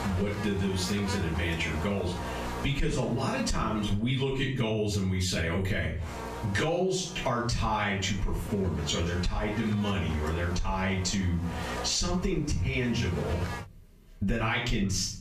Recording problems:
off-mic speech; far
squashed, flat; heavily
room echo; slight; dies away in 0.3 s
electrical hum; loud; until 4 s and from 6 to 14 s; 60 Hz, 9 dB below the speech

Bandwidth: 14.5 kHz